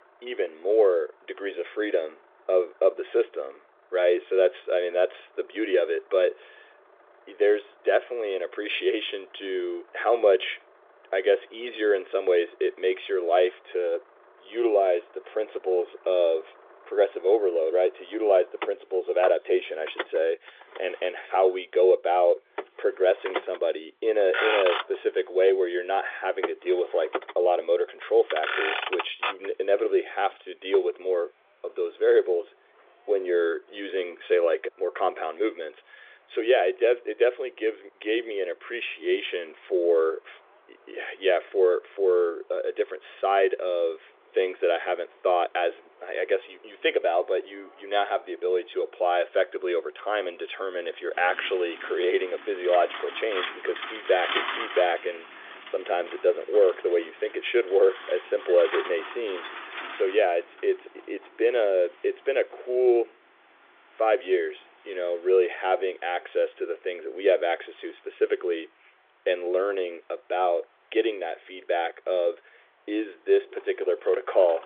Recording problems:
phone-call audio; nothing above 3.5 kHz
traffic noise; loud; throughout; 9 dB below the speech

